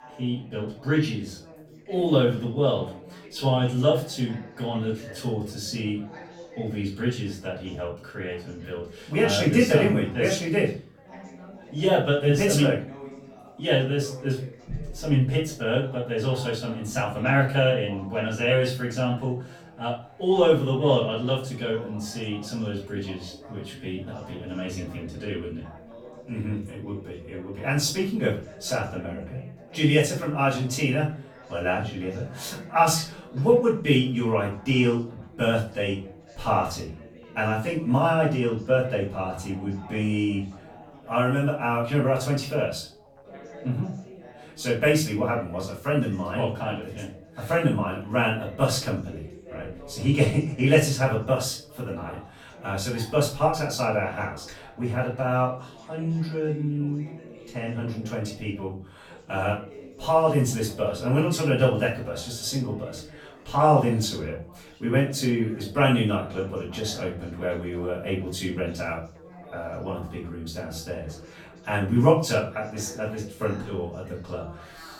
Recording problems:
off-mic speech; far
room echo; slight; dies away in 0.4 s
background chatter; faint; throughout; 4 voices, 20 dB below the speech

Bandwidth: 17.5 kHz